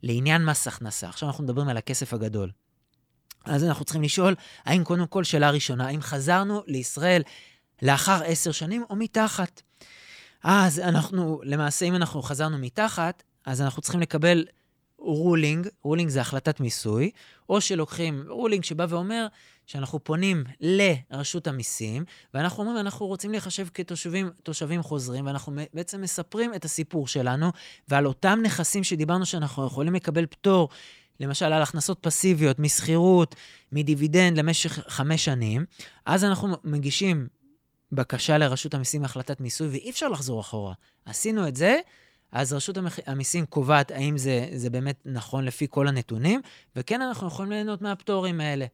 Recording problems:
none

